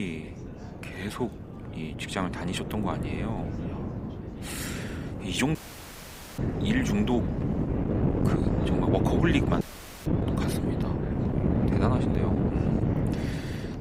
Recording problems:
thin; very slightly; fading below 800 Hz
wind noise on the microphone; heavy; as loud as the speech
chatter from many people; noticeable; throughout; 20 dB below the speech
abrupt cut into speech; at the start
audio cutting out; at 5.5 s for 1 s and at 9.5 s

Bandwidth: 15.5 kHz